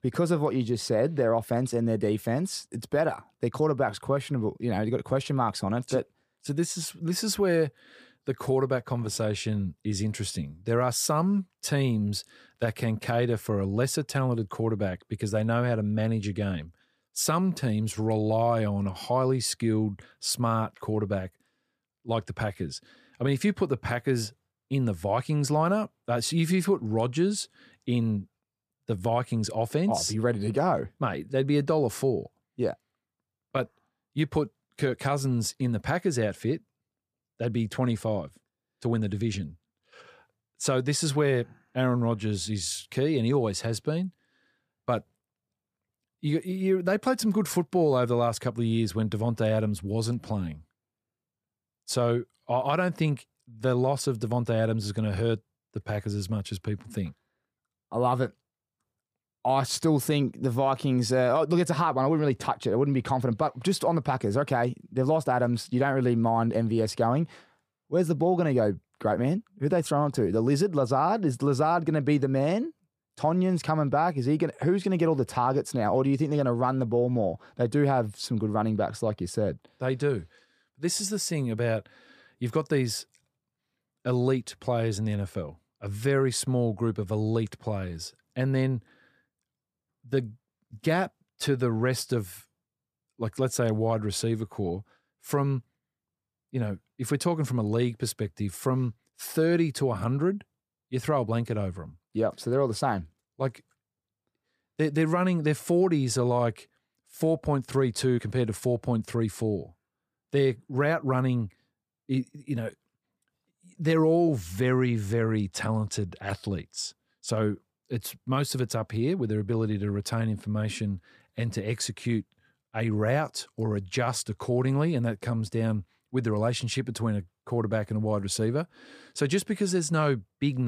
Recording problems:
abrupt cut into speech; at the end

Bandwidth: 15 kHz